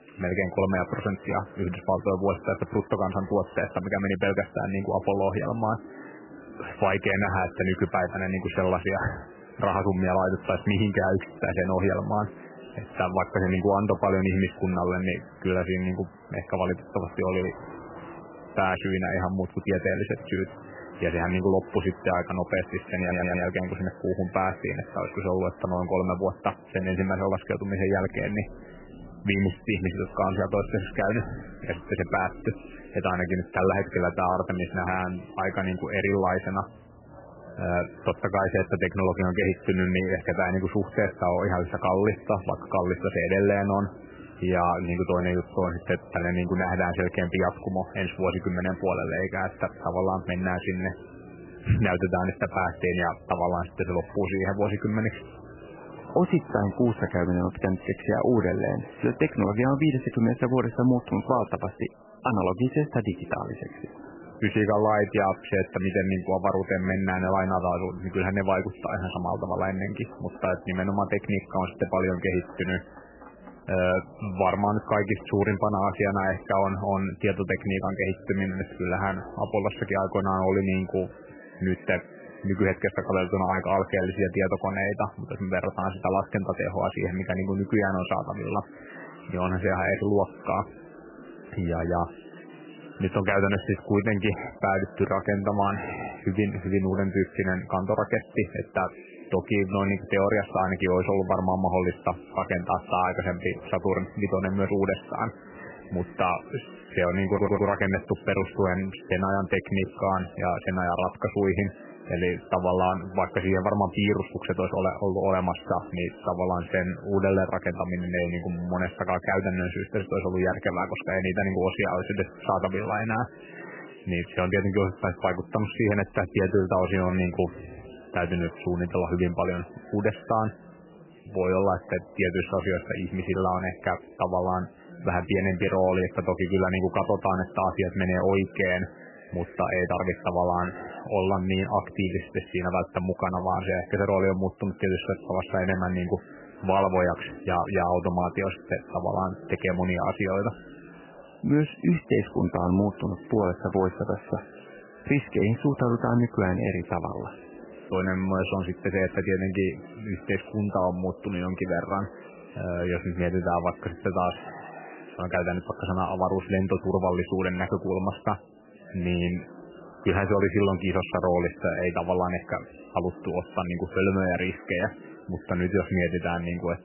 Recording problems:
garbled, watery; badly; nothing above 3 kHz
chatter from many people; noticeable; throughout; 20 dB below the speech
rain or running water; faint; throughout; 25 dB below the speech
audio stuttering; at 23 s and at 1:47

